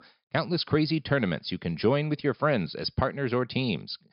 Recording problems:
high frequencies cut off; noticeable; nothing above 5.5 kHz

